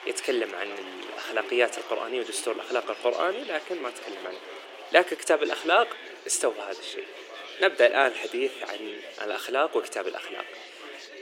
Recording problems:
thin; very; fading below 350 Hz
chatter from many people; noticeable; throughout; 15 dB below the speech

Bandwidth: 16.5 kHz